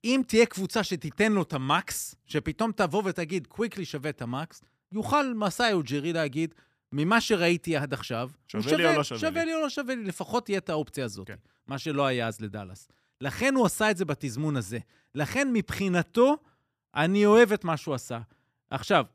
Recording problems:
none

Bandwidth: 14.5 kHz